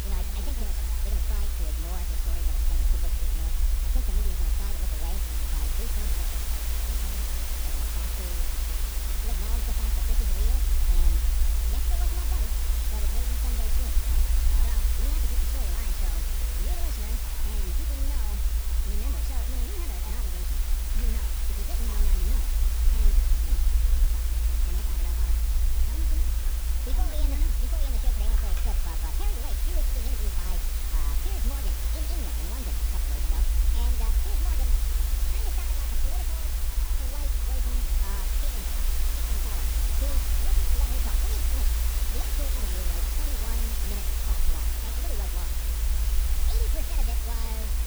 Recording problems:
wrong speed and pitch; too fast and too high; 1.6 times normal speed
hiss; very loud; throughout; 10 dB above the speech
low rumble; loud; throughout; 5 dB below the speech
household noises; noticeable; throughout; 10 dB below the speech
voice in the background; noticeable; throughout; 15 dB below the speech

